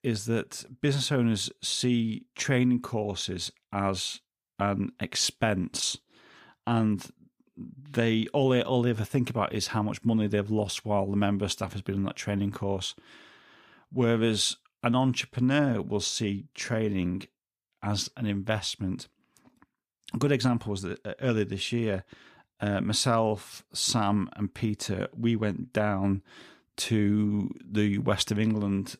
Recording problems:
none

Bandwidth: 14.5 kHz